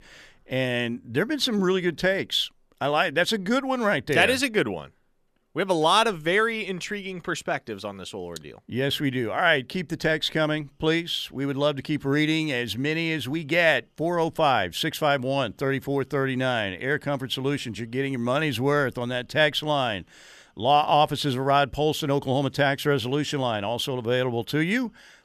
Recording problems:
none

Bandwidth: 14.5 kHz